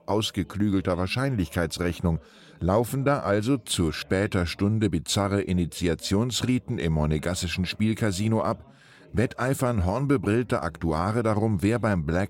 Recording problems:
background chatter; faint; throughout; 2 voices, 30 dB below the speech

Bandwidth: 16 kHz